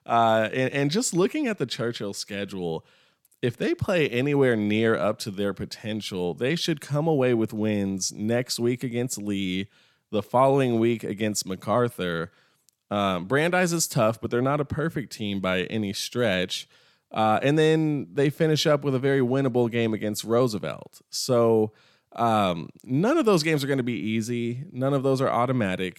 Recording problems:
none

